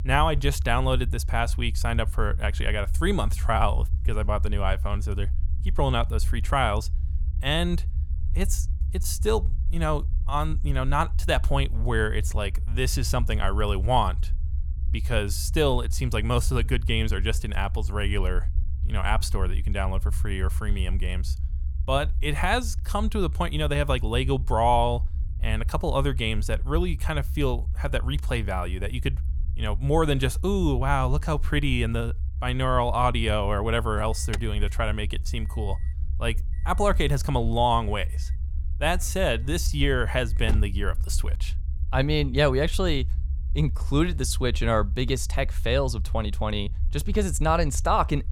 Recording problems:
low rumble; faint; throughout; 20 dB below the speech
alarm; noticeable; from 34 to 41 s; peak 1 dB below the speech

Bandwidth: 17.5 kHz